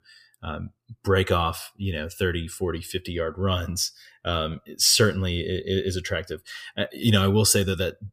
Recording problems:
none

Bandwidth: 15 kHz